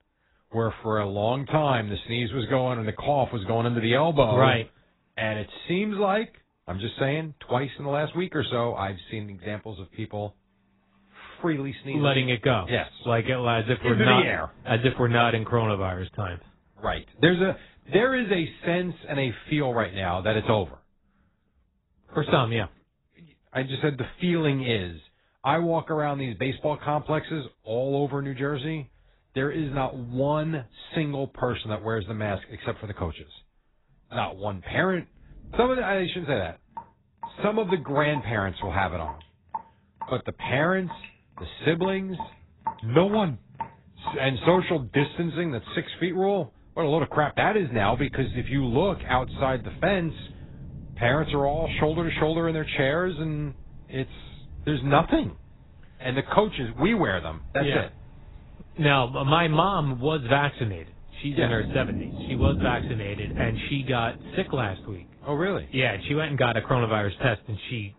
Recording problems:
garbled, watery; badly; nothing above 4 kHz
rain or running water; noticeable; throughout; 15 dB below the speech

